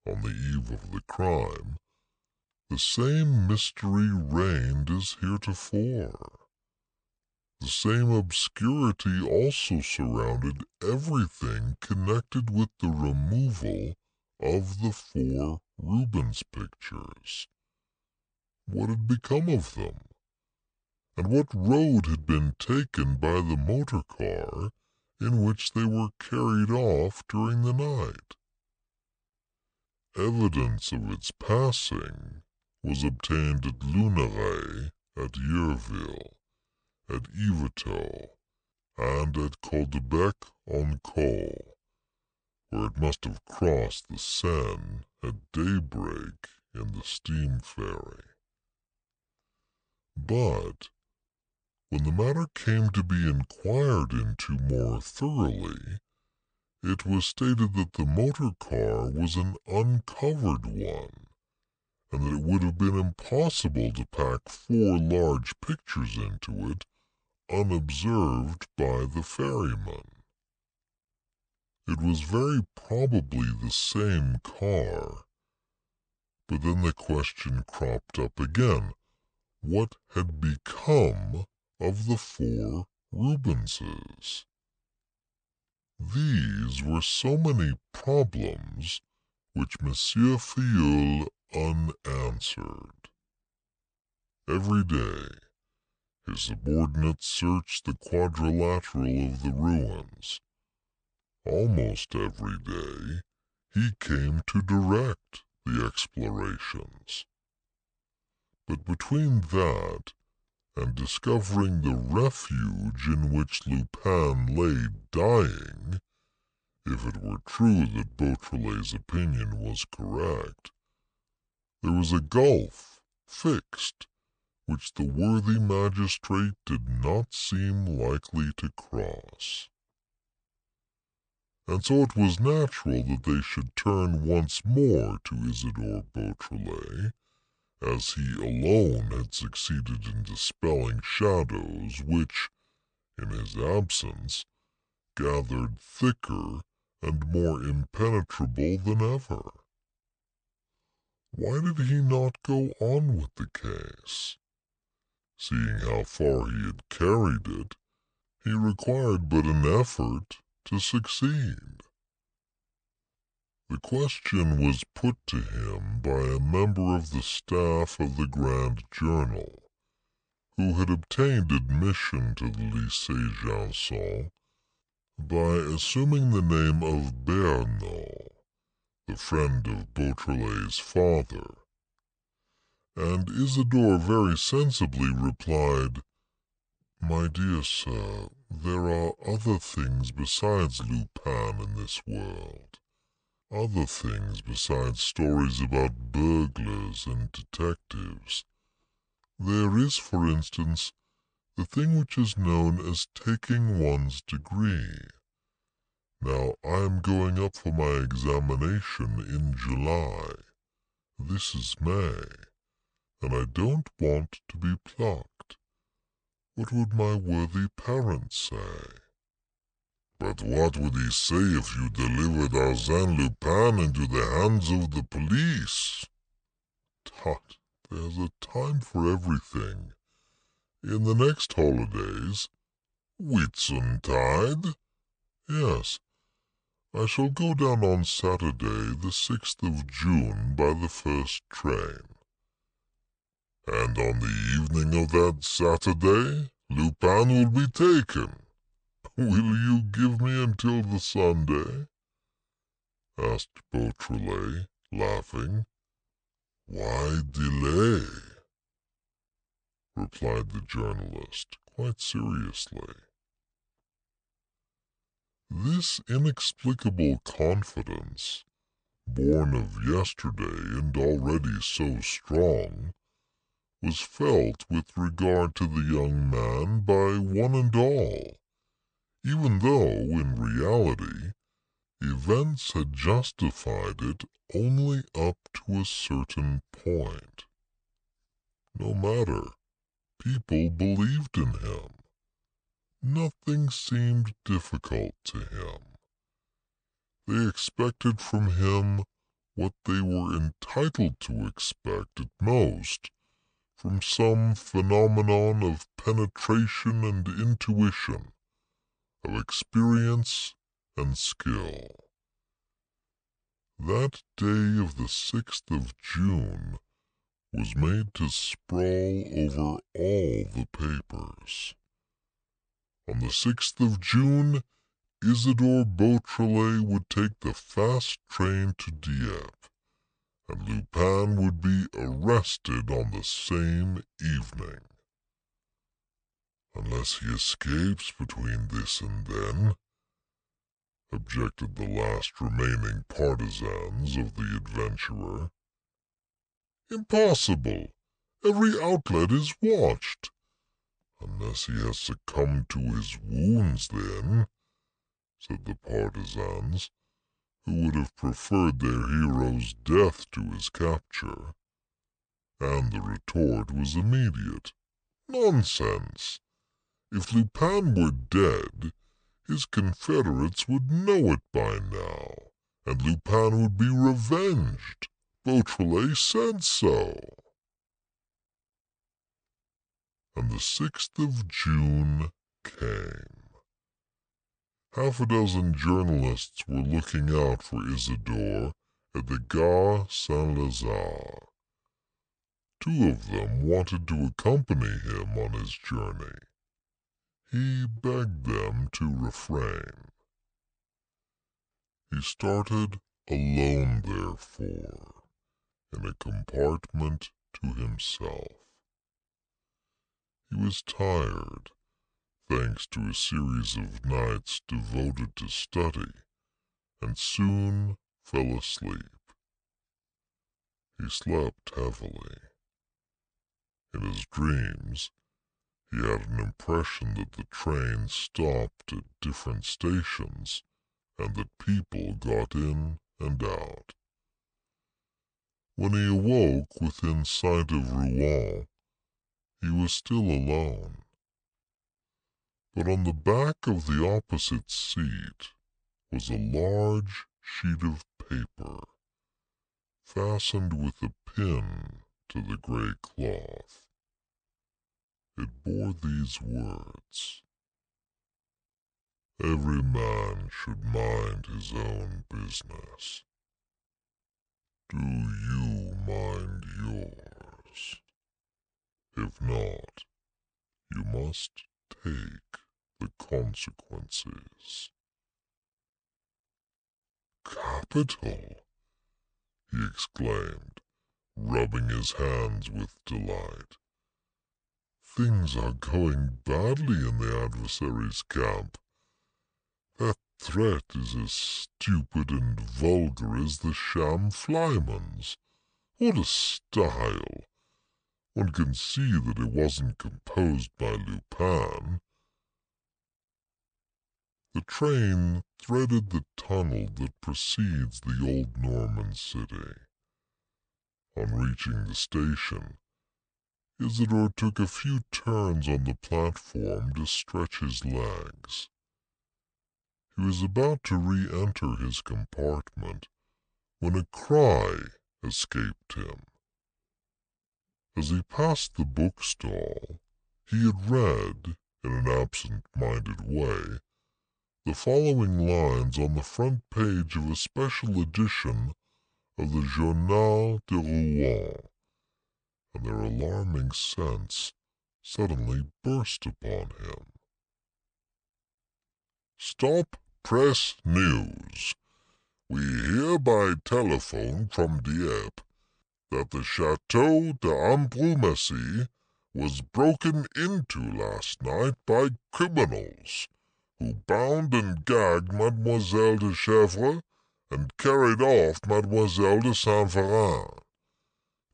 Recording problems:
wrong speed and pitch; too slow and too low; 0.7 times normal speed

